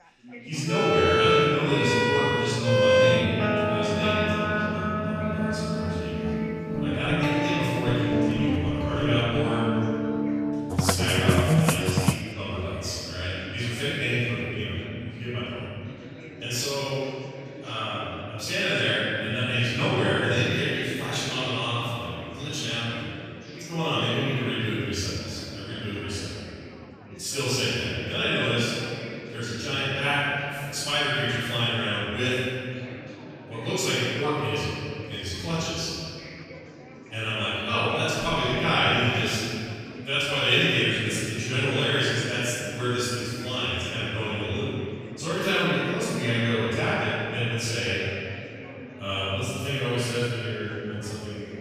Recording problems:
room echo; strong; dies away in 2.3 s
off-mic speech; far
background music; very loud; until 12 s; 1 dB above the speech
chatter from many people; noticeable; throughout; 15 dB below the speech

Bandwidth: 14.5 kHz